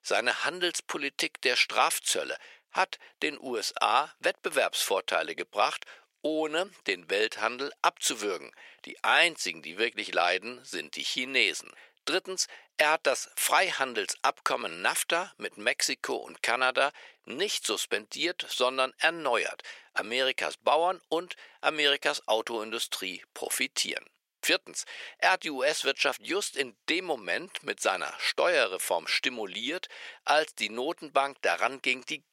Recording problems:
thin; very; fading below 450 Hz

